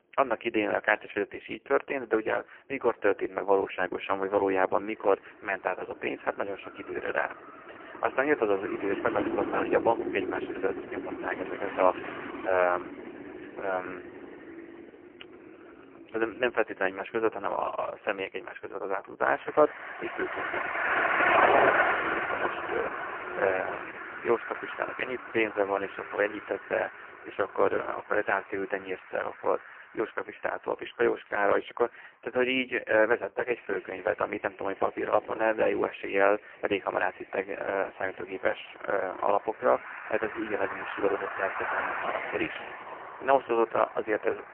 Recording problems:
phone-call audio; poor line; nothing above 3 kHz
traffic noise; loud; throughout; 3 dB below the speech

